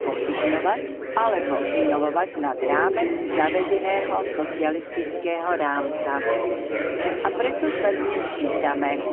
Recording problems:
phone-call audio; poor line; nothing above 3 kHz
chatter from many people; loud; throughout; 1 dB below the speech

